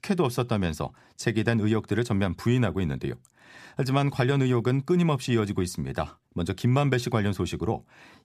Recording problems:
none

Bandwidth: 14.5 kHz